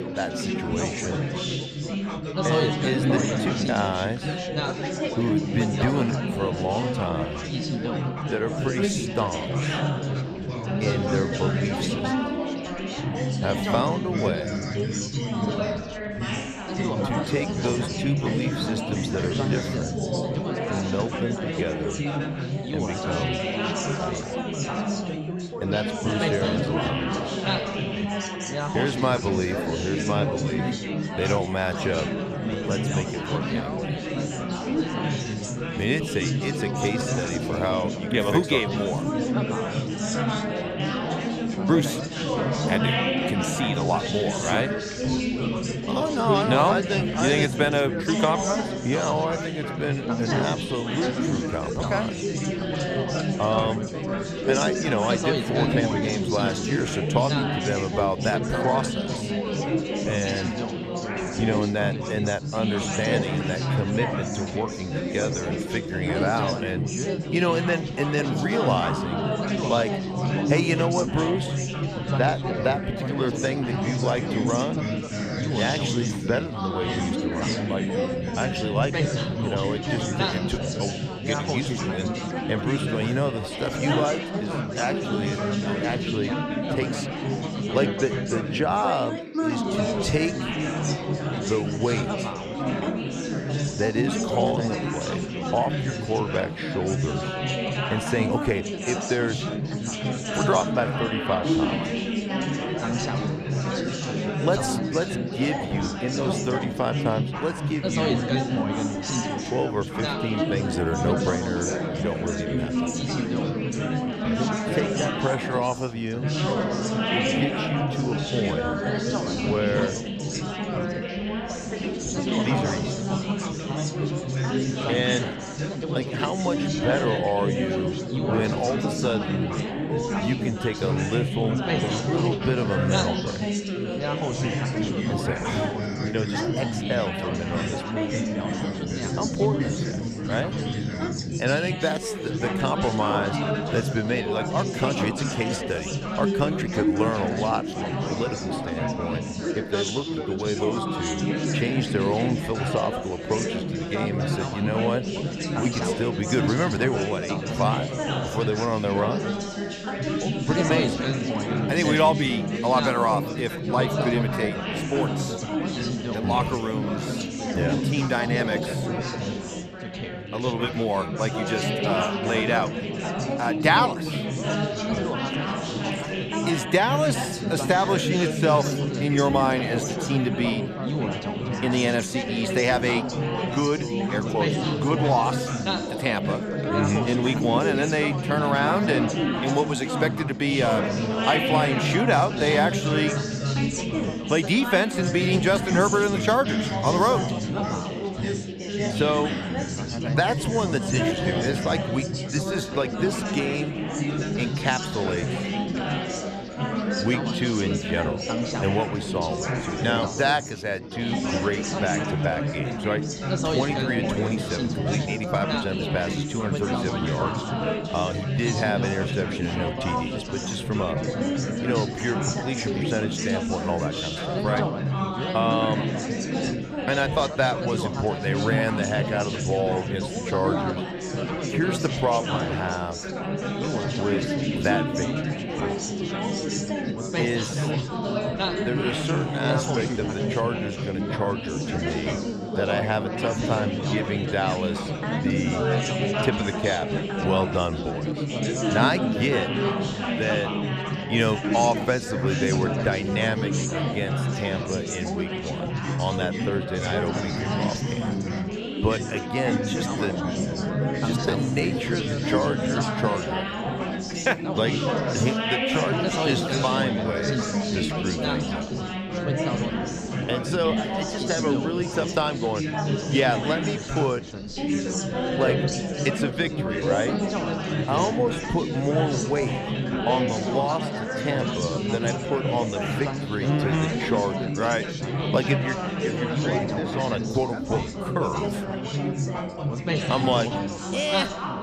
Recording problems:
chatter from many people; very loud; throughout; as loud as the speech

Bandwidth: 14.5 kHz